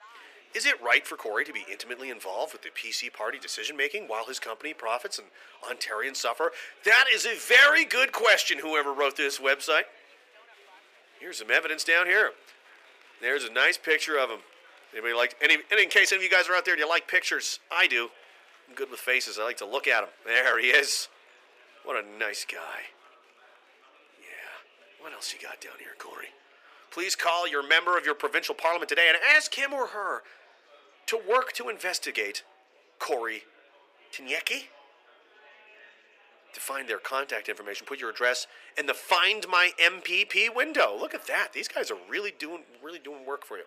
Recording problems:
thin; very; fading below 400 Hz
murmuring crowd; faint; throughout; 30 dB below the speech

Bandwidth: 15 kHz